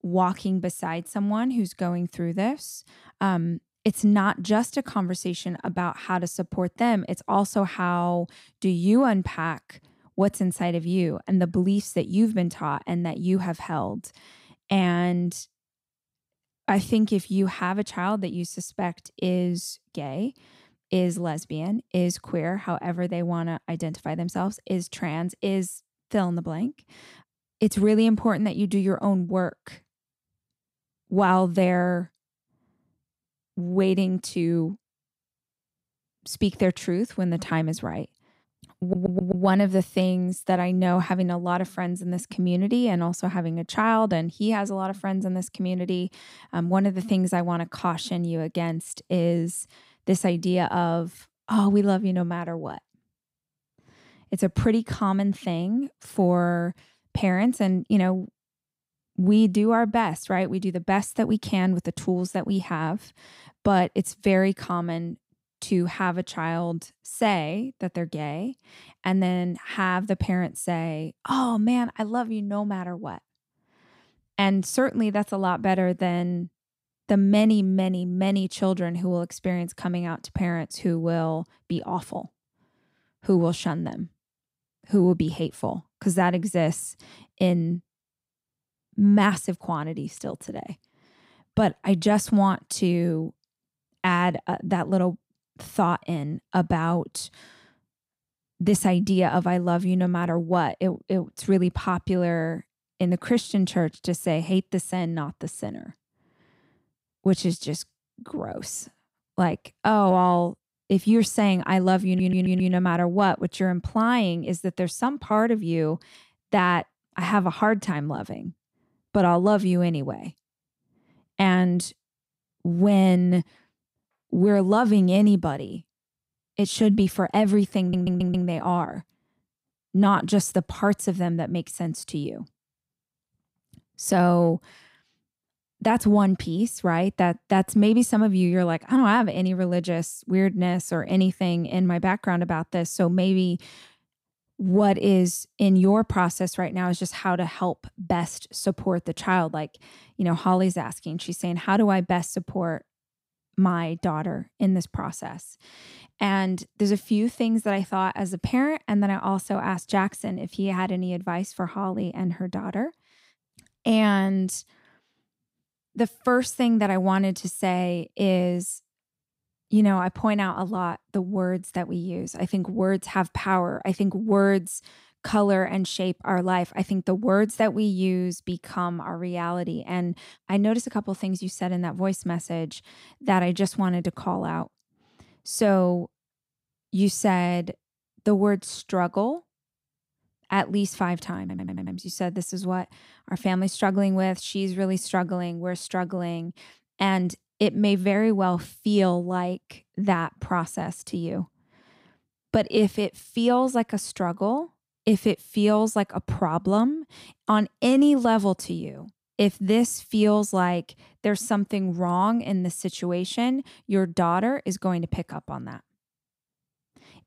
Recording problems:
audio stuttering; 4 times, first at 39 s

